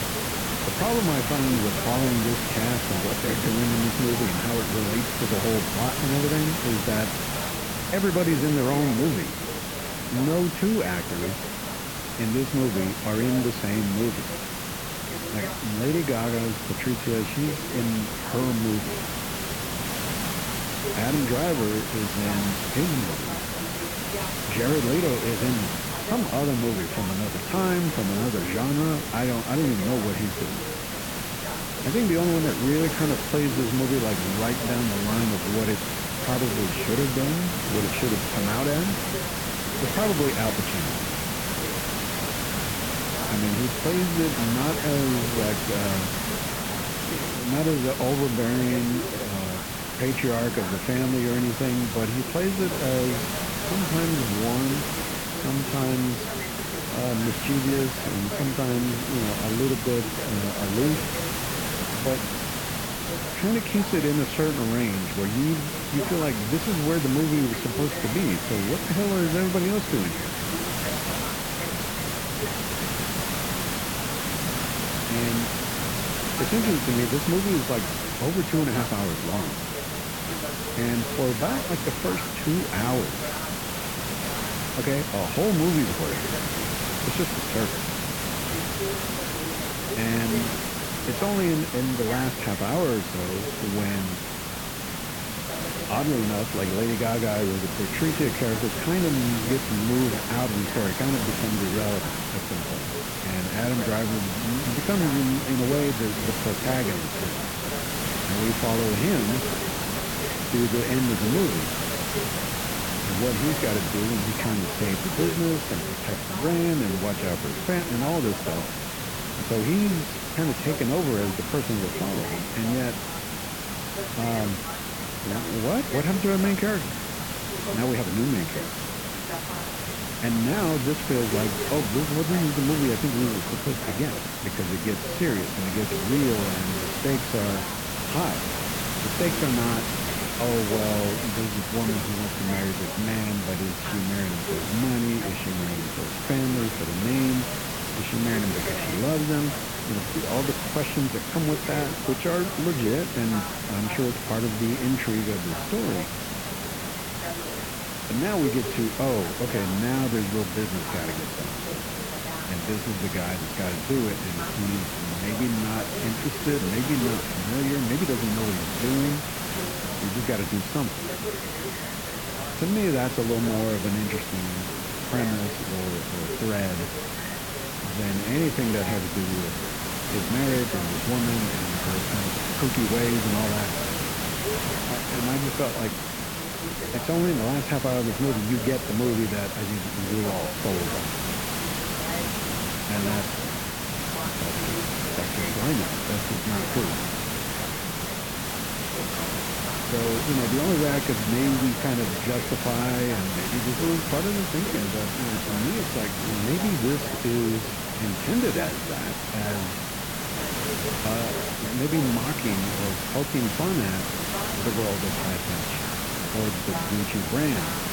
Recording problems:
muffled; very; fading above 2.5 kHz
hiss; loud; throughout; 1 dB below the speech
background chatter; noticeable; throughout; 2 voices, 15 dB below the speech

